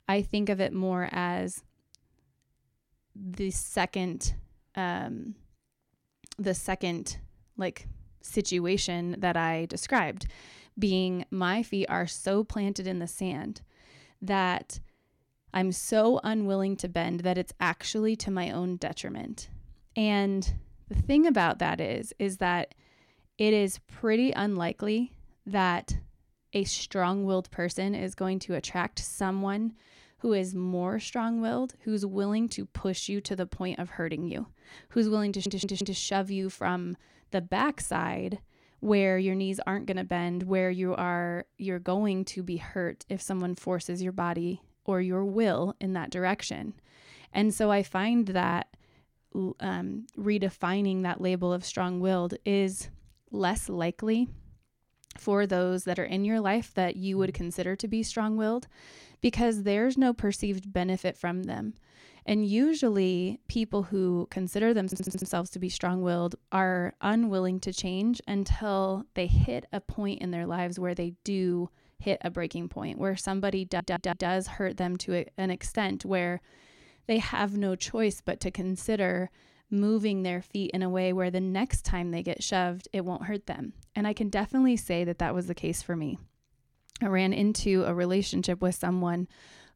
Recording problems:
audio stuttering; at 35 s, at 1:05 and at 1:14

